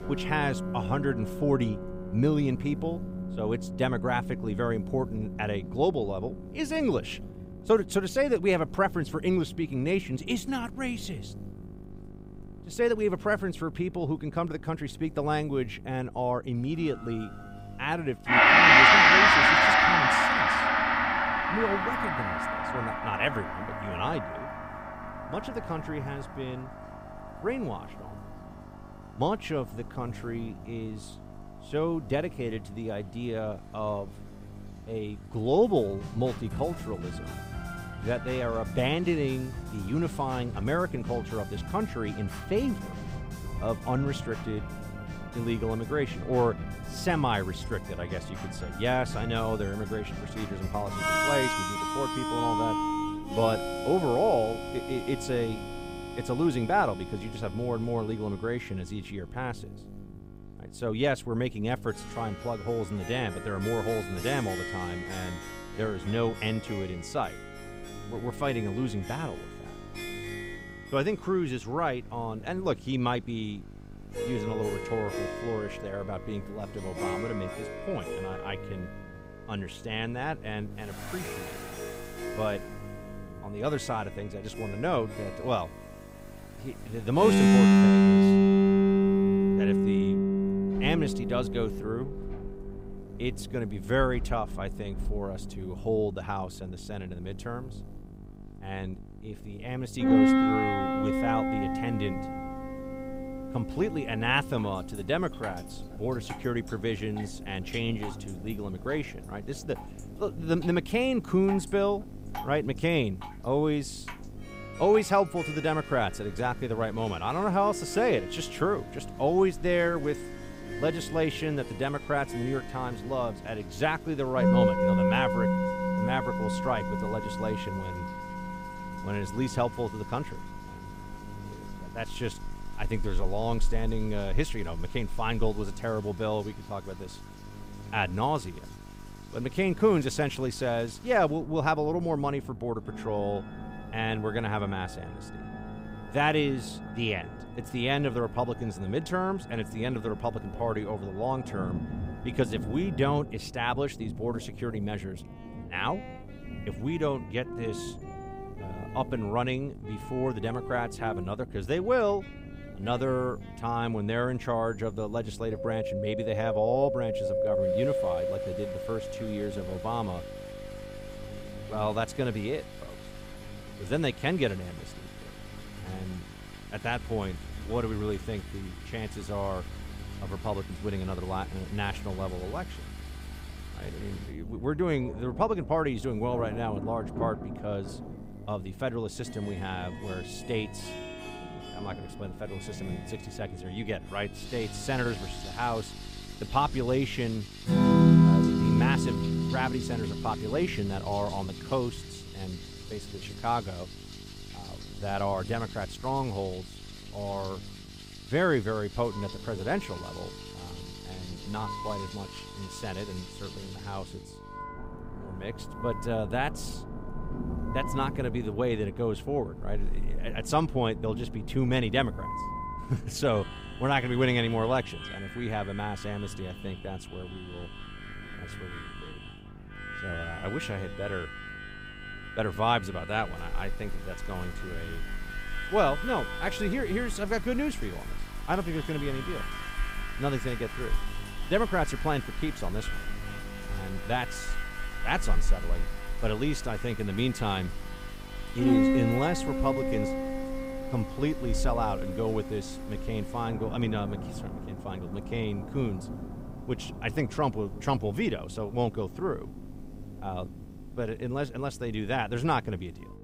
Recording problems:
background music; very loud; throughout; 3 dB above the speech
rain or running water; noticeable; throughout; 15 dB below the speech
electrical hum; faint; throughout; 50 Hz, 20 dB below the speech

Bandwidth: 15.5 kHz